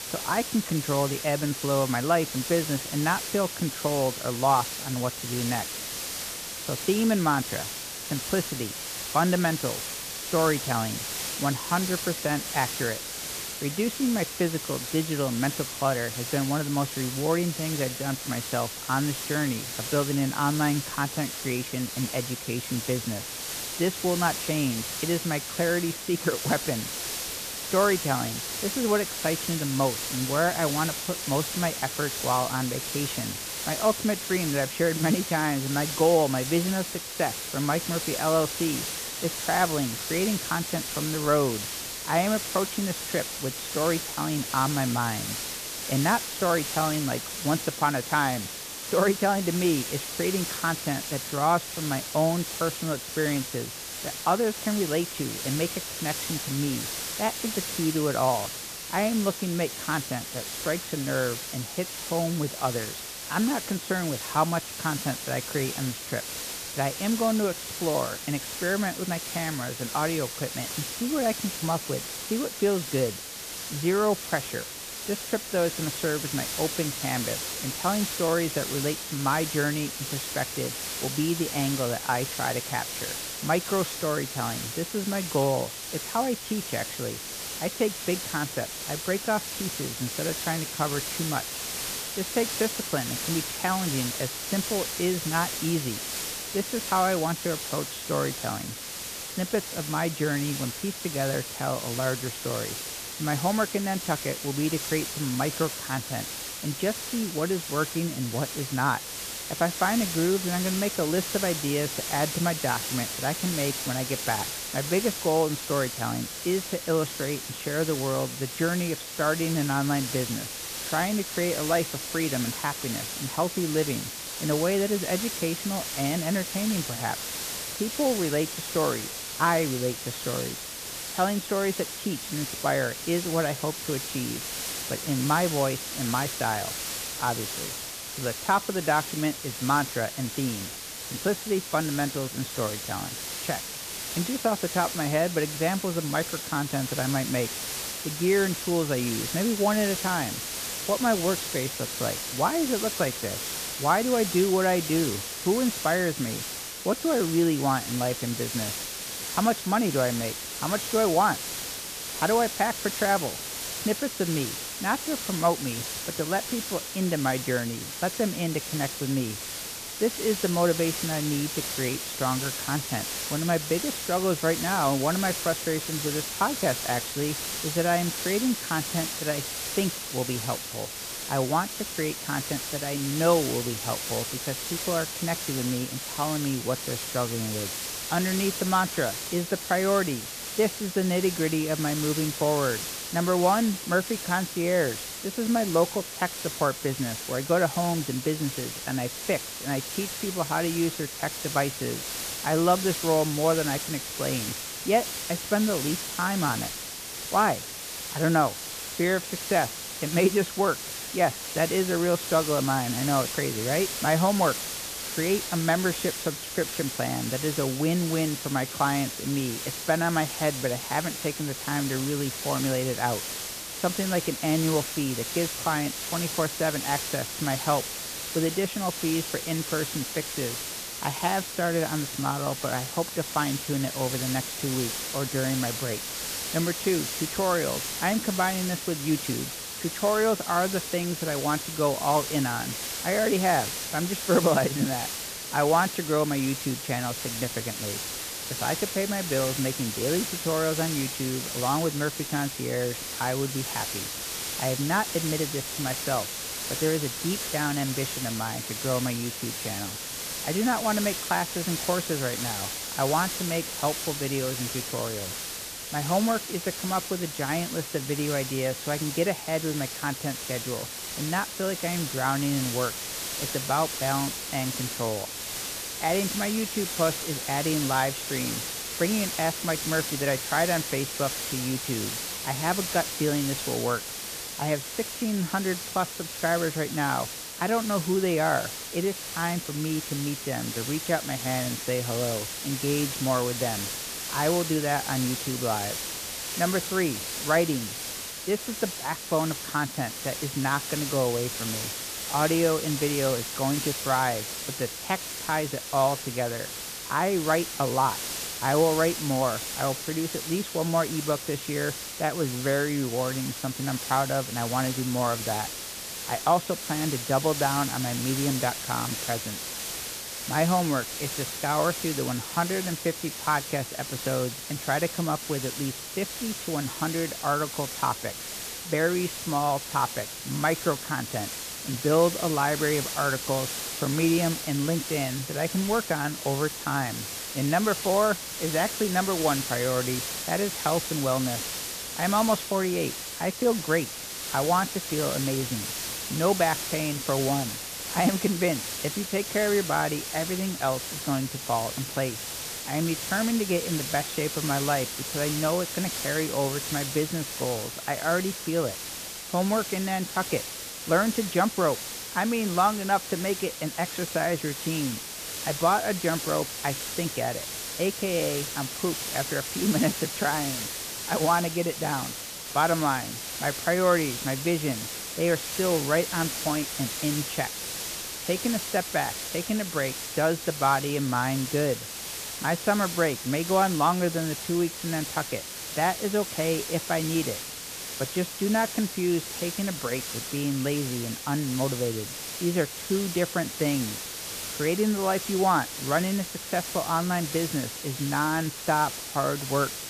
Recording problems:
high frequencies cut off; severe; nothing above 4 kHz
hiss; loud; throughout; 4 dB below the speech

